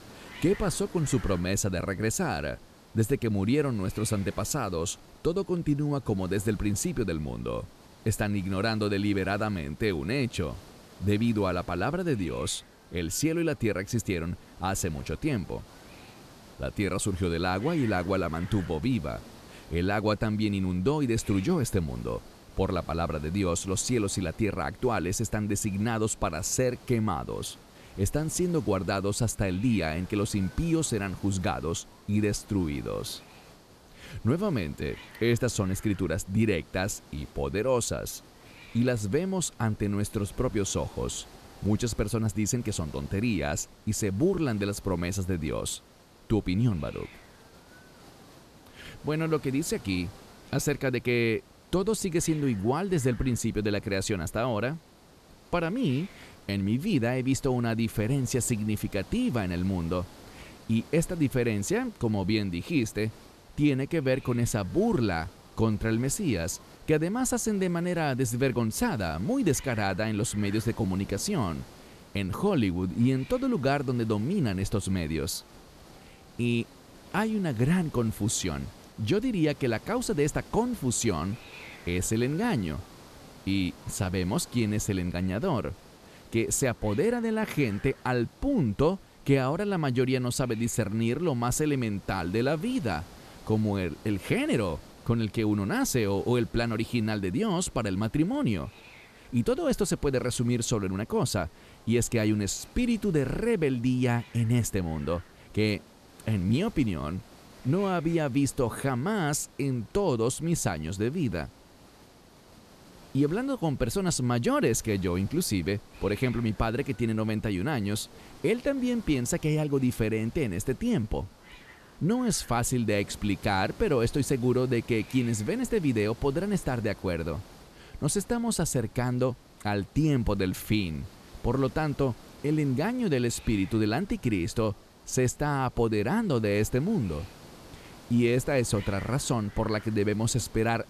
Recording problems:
hiss; faint; throughout; 20 dB below the speech

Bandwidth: 14 kHz